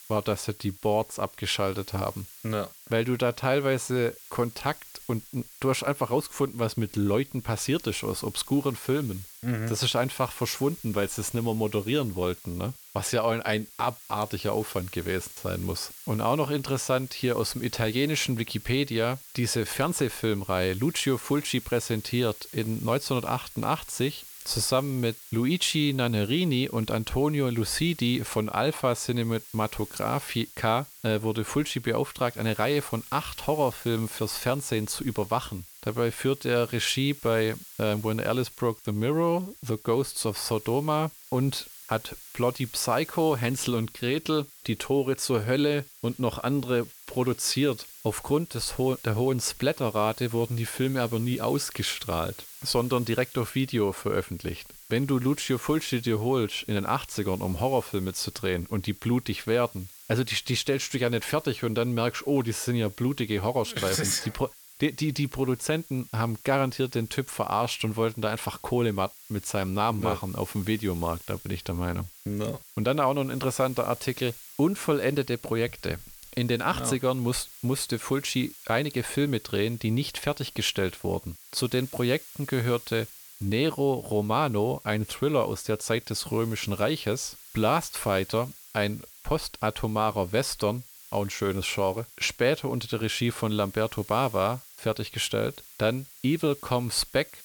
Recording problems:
hiss; noticeable; throughout; 15 dB below the speech

